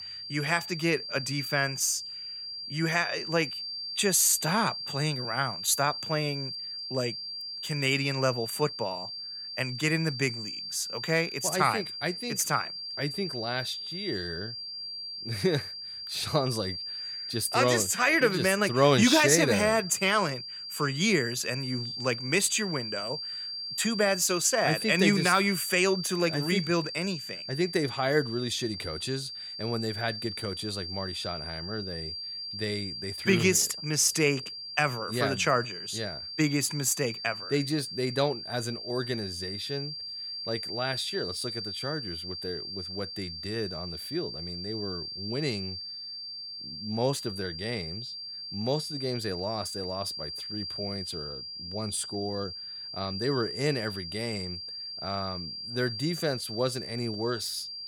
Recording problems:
high-pitched whine; loud; throughout; 4.5 kHz, 7 dB below the speech

